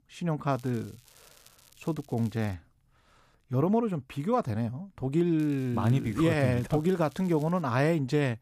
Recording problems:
crackling; faint; from 0.5 to 2.5 s and from 5.5 to 7.5 s; 25 dB below the speech

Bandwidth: 14.5 kHz